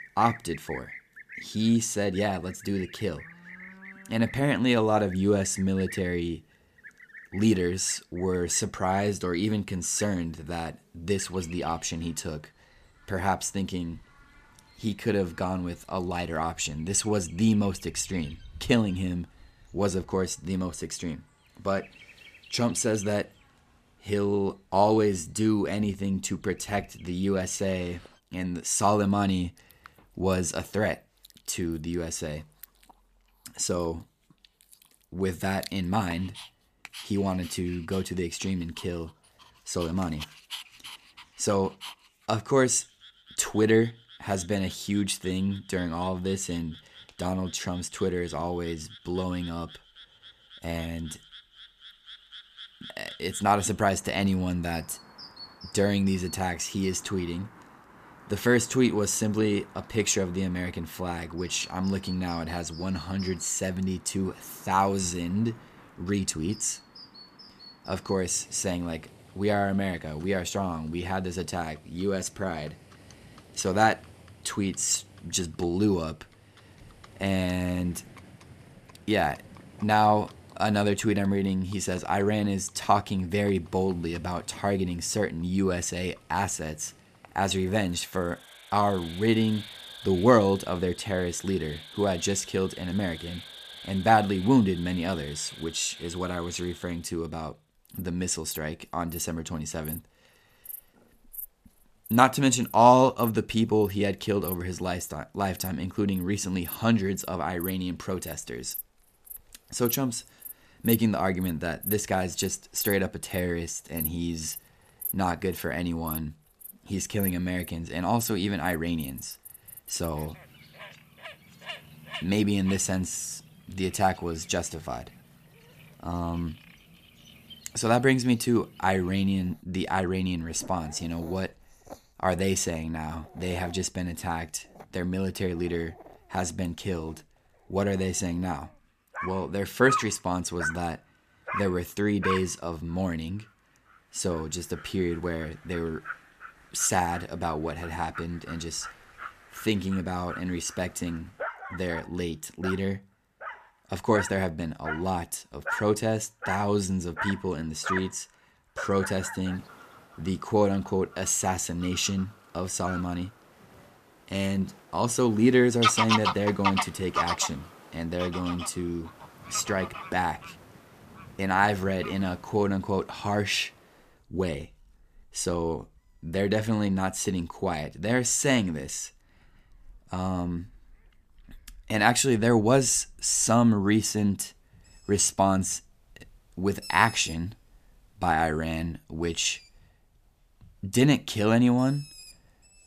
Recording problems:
animal sounds; noticeable; throughout; 10 dB below the speech

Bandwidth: 14.5 kHz